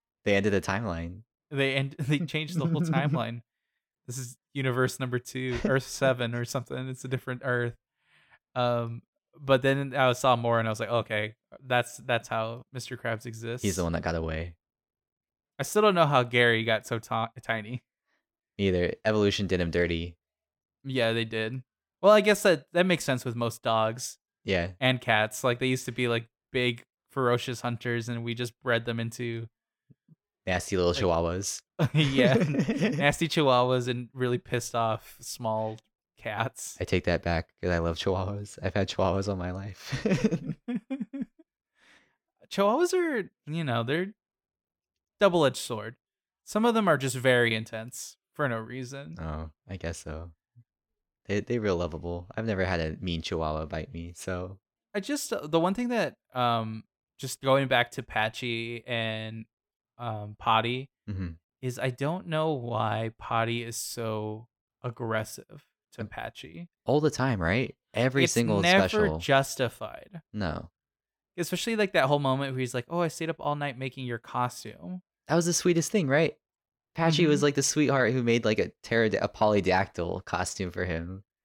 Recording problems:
none

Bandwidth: 17 kHz